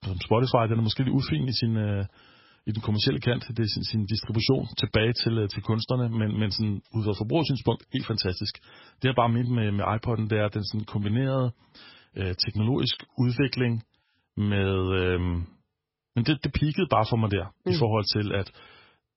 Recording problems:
garbled, watery; badly; nothing above 5.5 kHz

